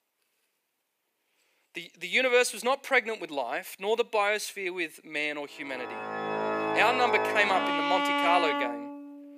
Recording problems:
thin; somewhat; fading below 400 Hz
background music; loud; from 6 s on; 1 dB below the speech

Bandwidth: 15 kHz